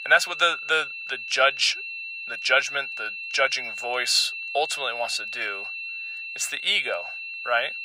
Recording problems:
thin; very; fading below 700 Hz
high-pitched whine; loud; throughout; 2.5 kHz, 8 dB below the speech

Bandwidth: 15.5 kHz